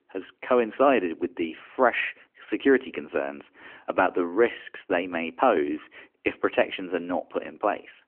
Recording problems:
phone-call audio; nothing above 3 kHz

